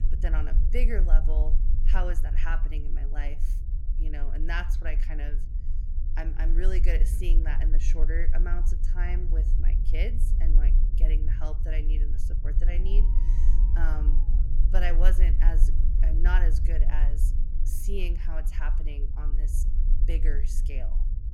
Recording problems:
low rumble; loud; throughout; 10 dB below the speech
alarm; noticeable; from 12 to 14 s; peak 9 dB below the speech

